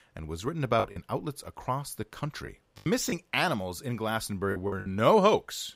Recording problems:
choppy; very; 7% of the speech affected

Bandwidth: 15.5 kHz